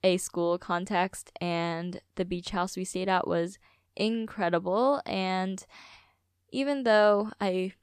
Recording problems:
none

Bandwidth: 14.5 kHz